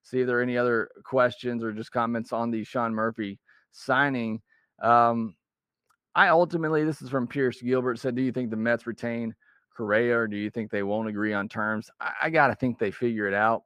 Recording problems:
muffled; slightly; fading above 2.5 kHz

